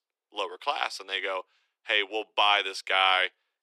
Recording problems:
thin; very; fading below 350 Hz

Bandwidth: 13.5 kHz